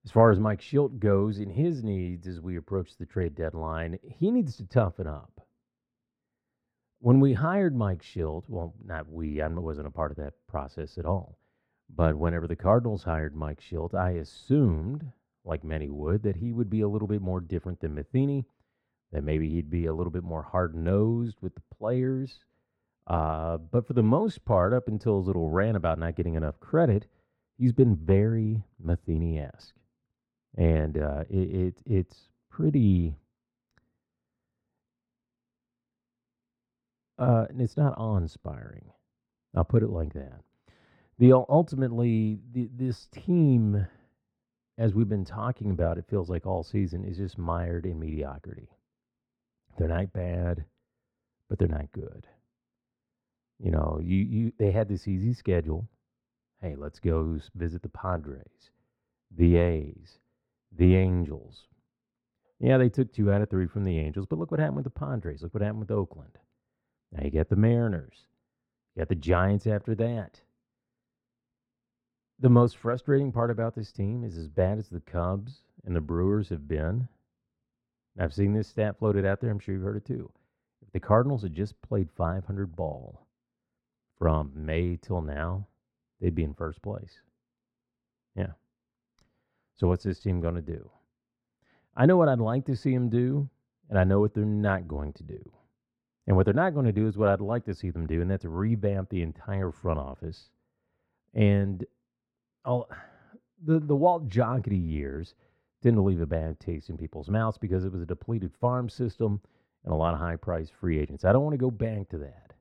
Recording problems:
muffled; very; fading above 4 kHz

